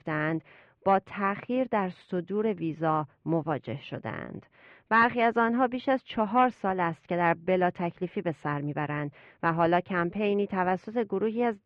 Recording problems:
muffled; very; fading above 2.5 kHz

